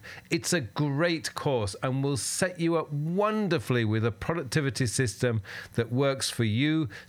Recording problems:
squashed, flat; somewhat

